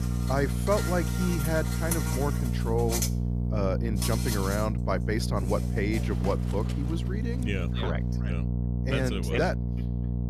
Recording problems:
electrical hum; loud; throughout; 60 Hz, 9 dB below the speech
animal sounds; loud; until 7.5 s; 6 dB below the speech

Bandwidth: 14.5 kHz